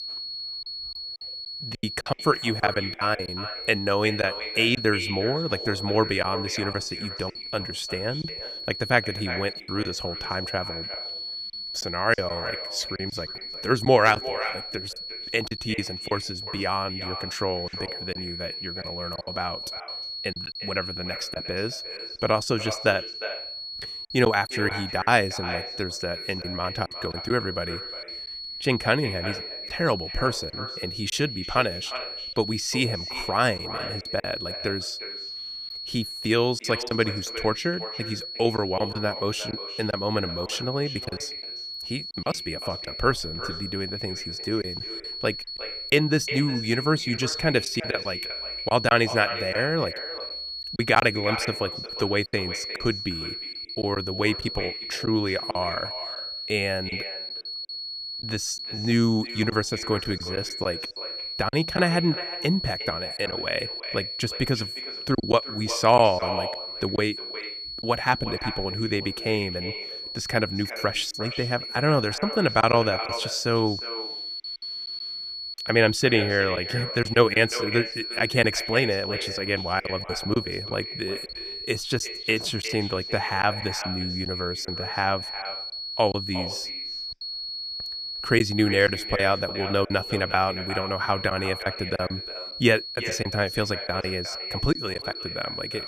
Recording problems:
echo of what is said; strong; throughout; 360 ms later, 10 dB below the speech
high-pitched whine; loud; throughout; 4.5 kHz, 6 dB below the speech
choppy; very; 5% of the speech affected

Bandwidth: 14.5 kHz